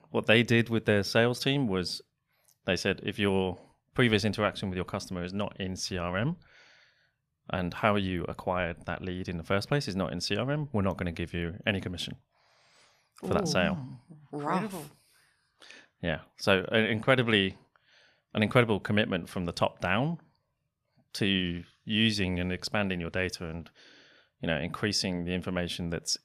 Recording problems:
none

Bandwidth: 14.5 kHz